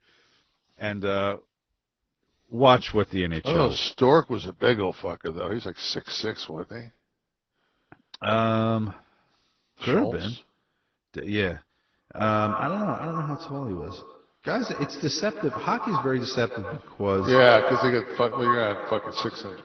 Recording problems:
echo of what is said; strong; from 12 s on; 120 ms later, 6 dB below the speech
garbled, watery; slightly; nothing above 6 kHz

